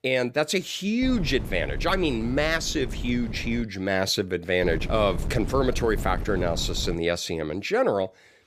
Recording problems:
wind noise on the microphone; occasional gusts; from 1 to 3.5 s and from 4.5 to 7 s; 15 dB below the speech

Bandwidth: 15 kHz